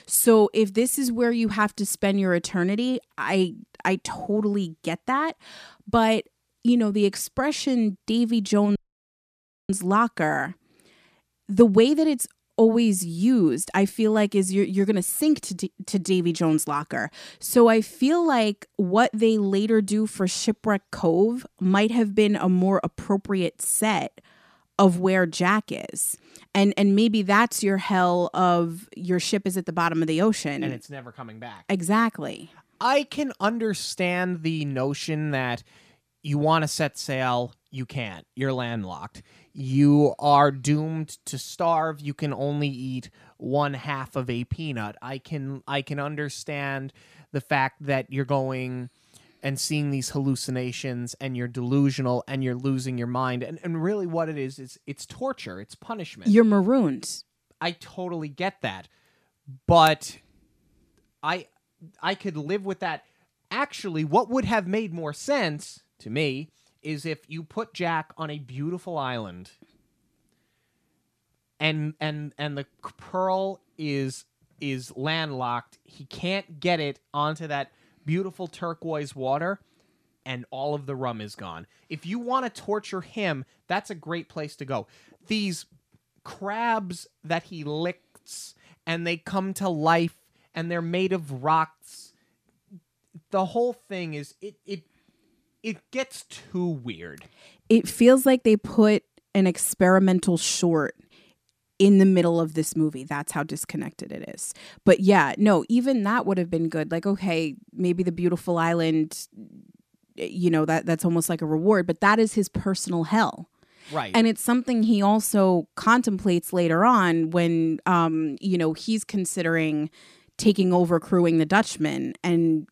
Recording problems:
audio cutting out; at 9 s for 1 s

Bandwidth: 14.5 kHz